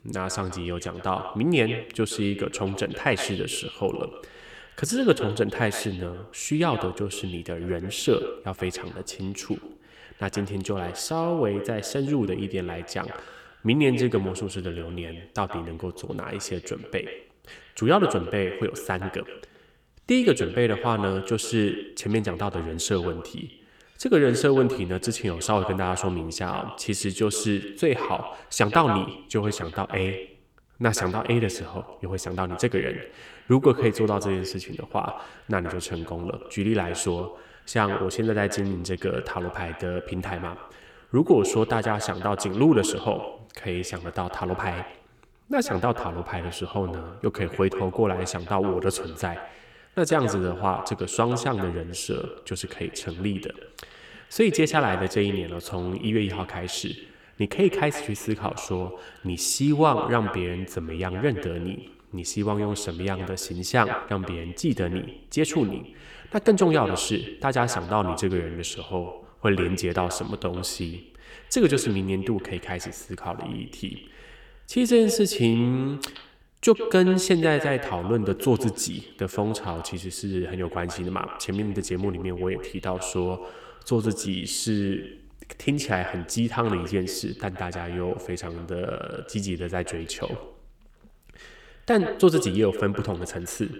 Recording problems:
echo of what is said; strong; throughout; 120 ms later, 10 dB below the speech

